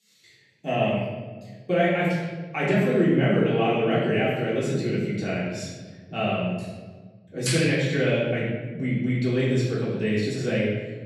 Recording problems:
off-mic speech; far
room echo; noticeable; dies away in 1.3 s

